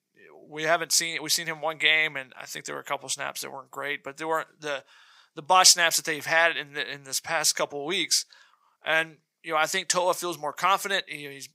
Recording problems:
thin; very; fading below 650 Hz

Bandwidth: 15.5 kHz